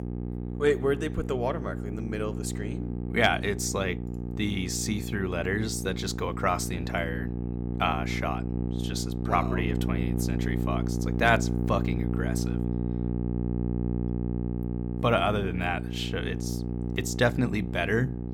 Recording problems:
electrical hum; loud; throughout; 60 Hz, 10 dB below the speech

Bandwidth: 17.5 kHz